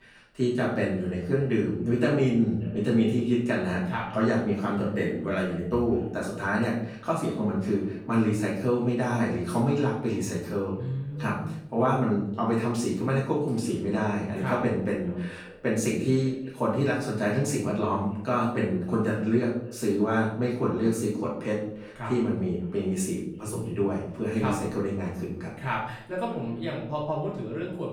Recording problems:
off-mic speech; far
room echo; noticeable; dies away in 0.6 s
echo of what is said; faint; throughout; 590 ms later, 25 dB below the speech

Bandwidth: 18.5 kHz